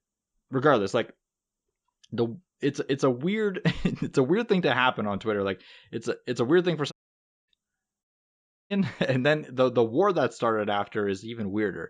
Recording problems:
audio cutting out; at 7 s for 0.5 s and at 8 s for 0.5 s

